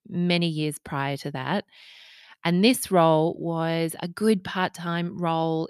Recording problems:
none

